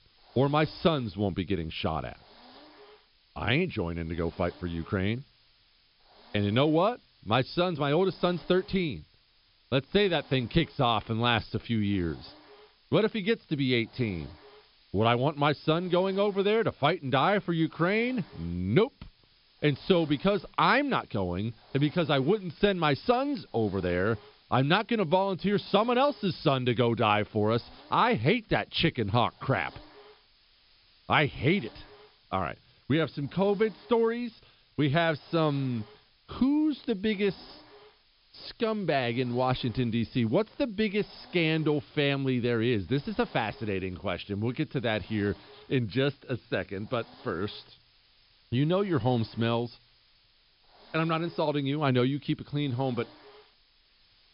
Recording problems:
high frequencies cut off; noticeable; nothing above 5.5 kHz
hiss; faint; throughout; 25 dB below the speech

